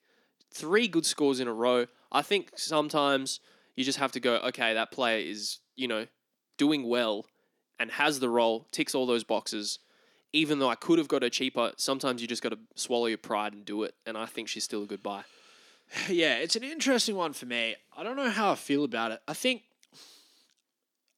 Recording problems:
thin; very slightly; fading below 300 Hz

